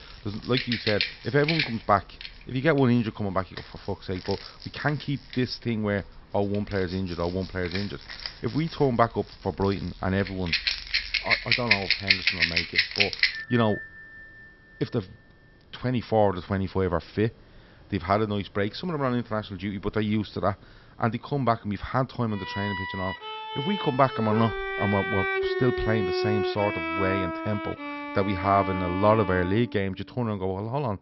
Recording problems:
high frequencies cut off; noticeable; nothing above 5.5 kHz
background music; loud; throughout; as loud as the speech

